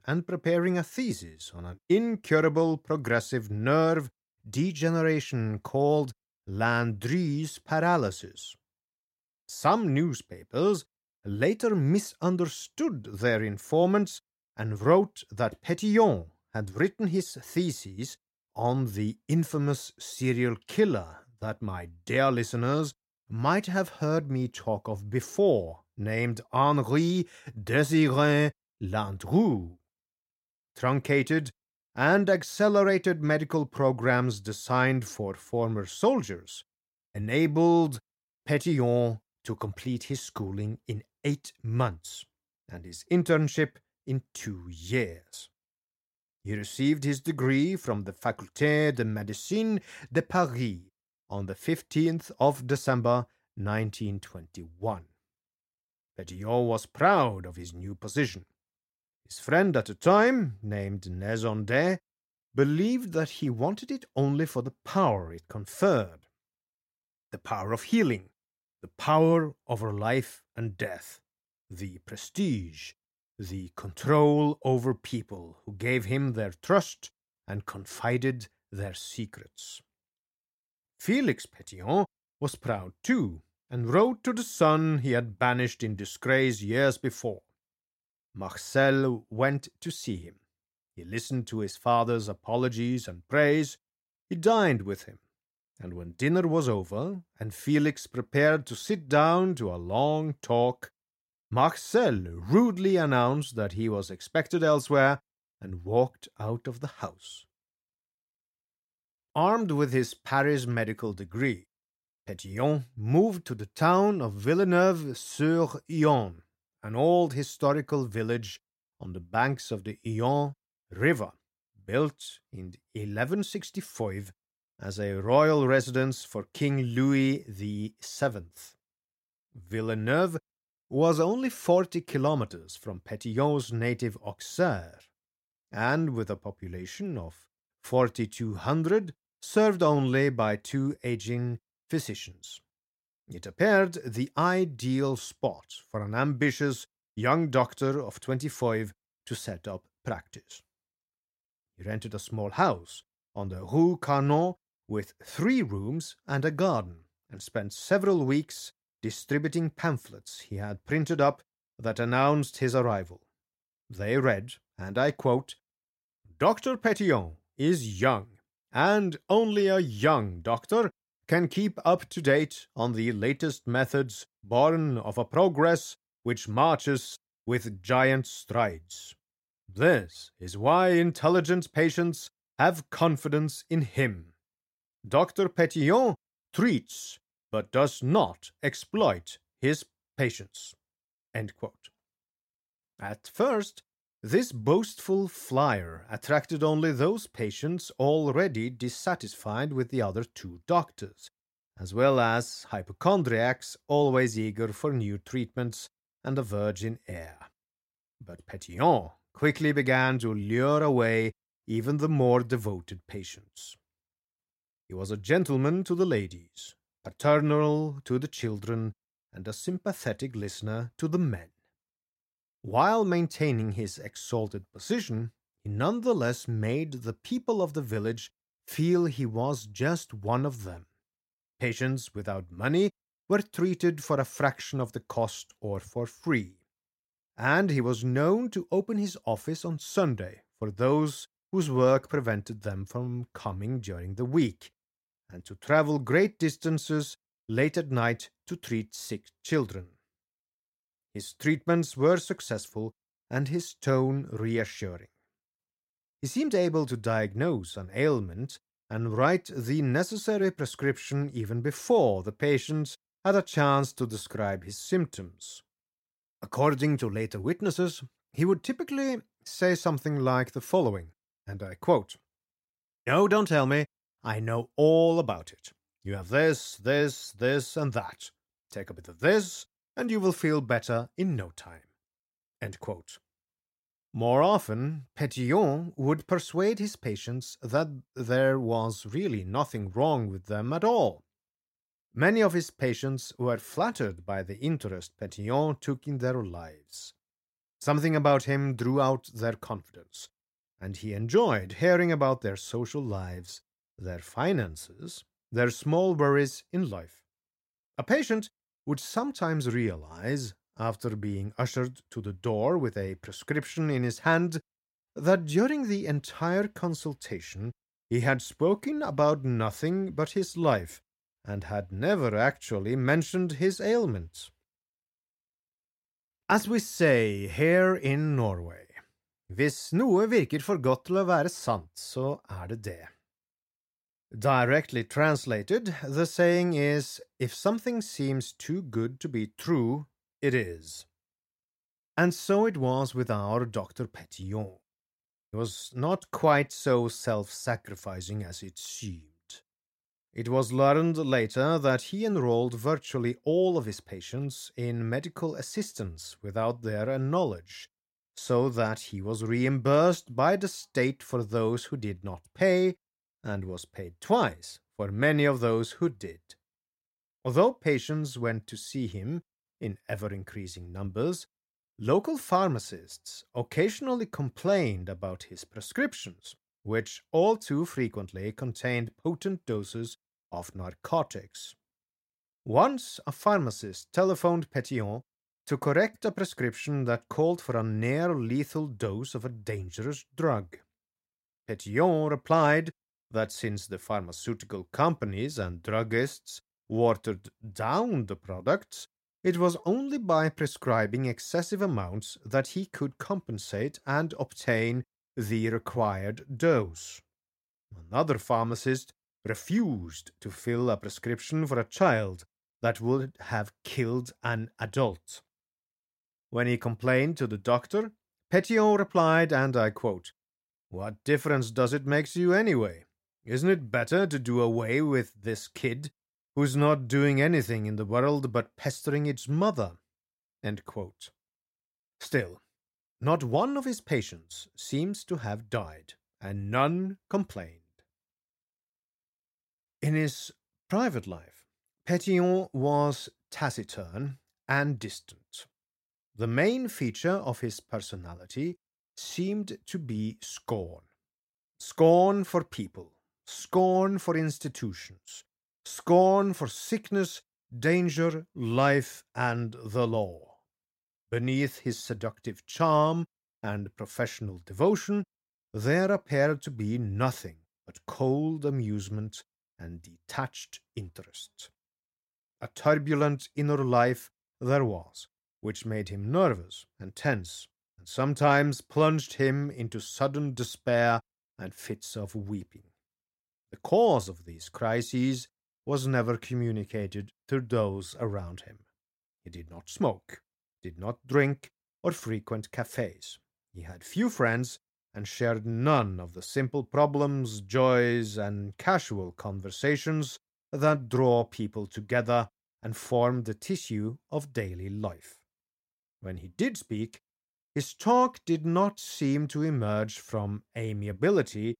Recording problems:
none

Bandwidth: 16 kHz